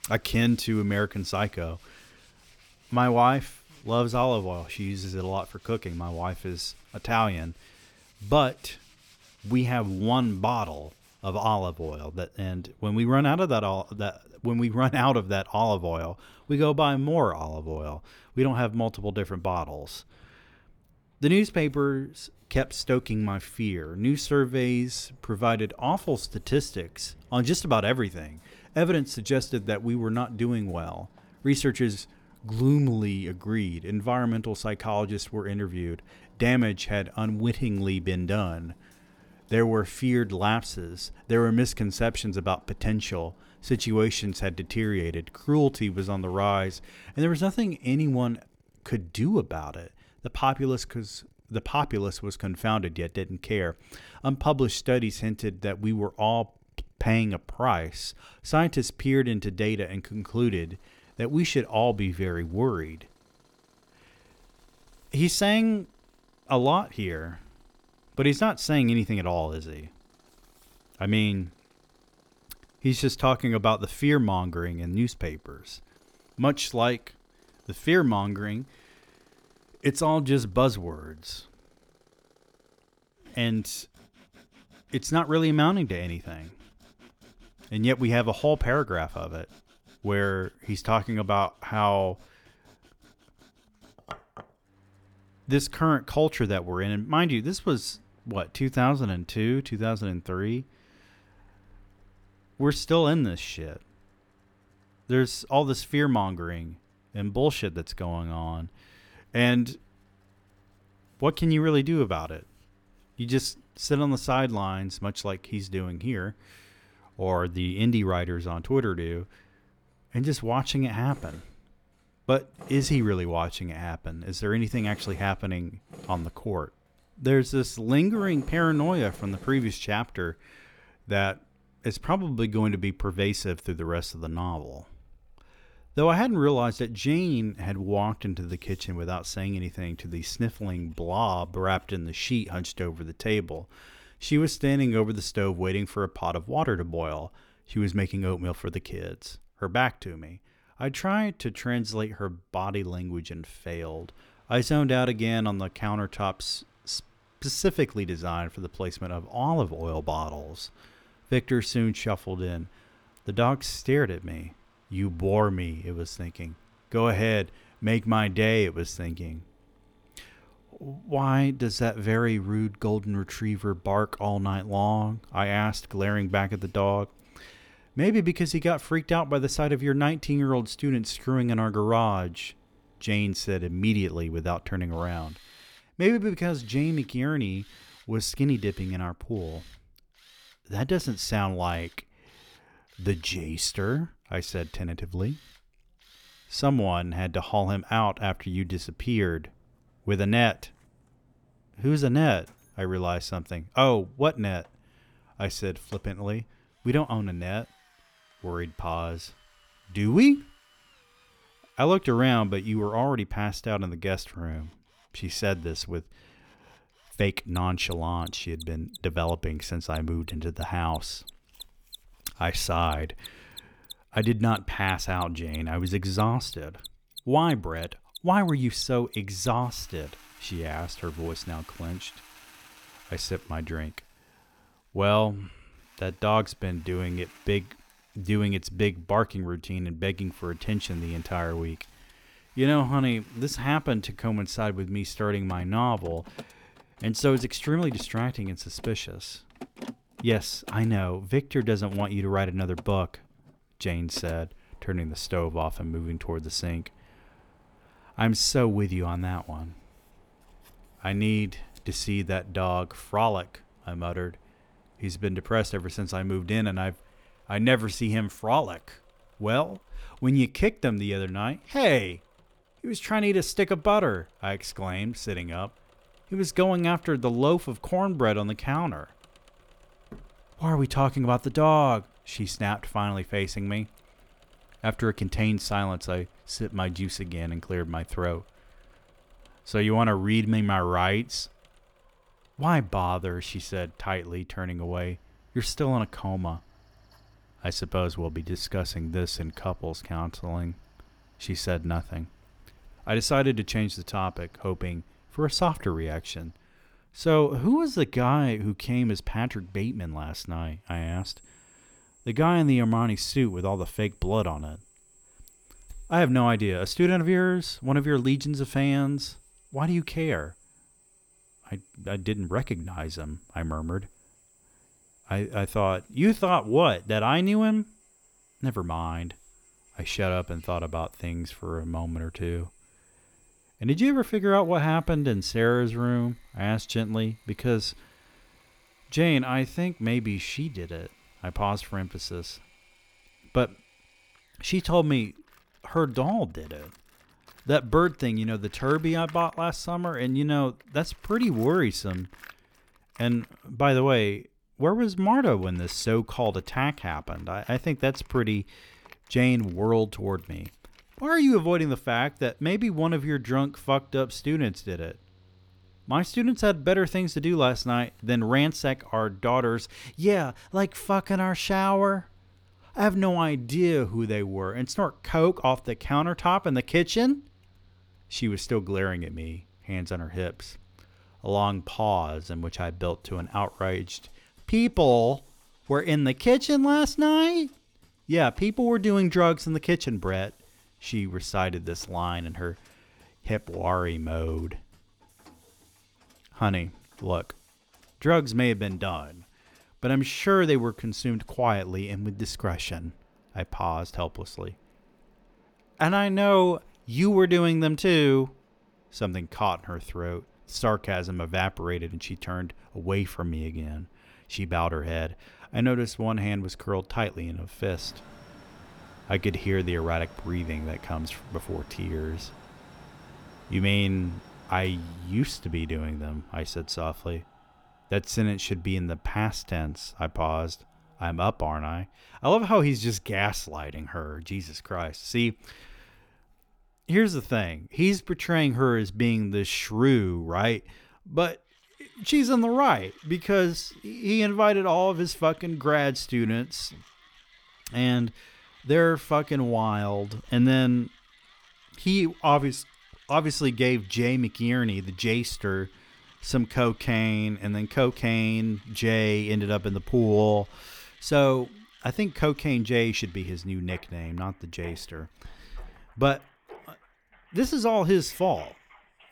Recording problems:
machinery noise; faint; throughout; 30 dB below the speech

